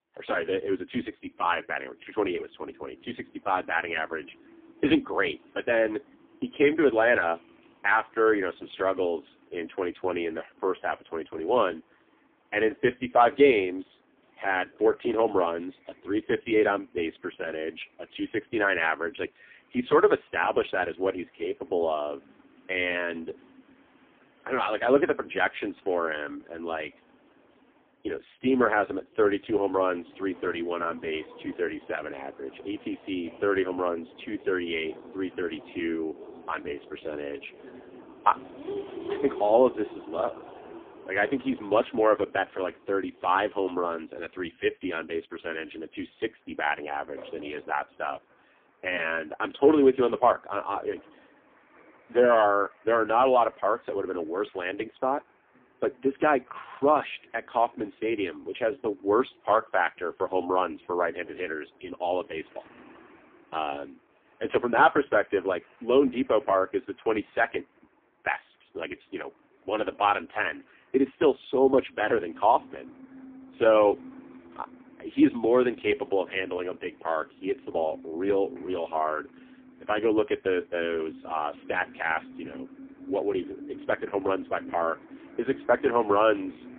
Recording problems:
phone-call audio; poor line; nothing above 3 kHz
traffic noise; faint; throughout; 20 dB below the speech

